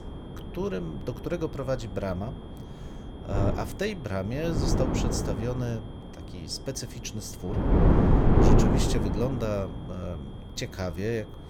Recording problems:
wind noise on the microphone; heavy; 3 dB above the speech
high-pitched whine; faint; throughout; 3 kHz, 25 dB below the speech

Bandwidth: 17 kHz